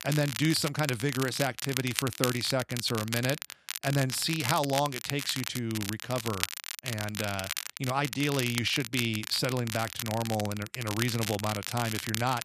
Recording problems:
crackle, like an old record; loud; 5 dB below the speech

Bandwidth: 14.5 kHz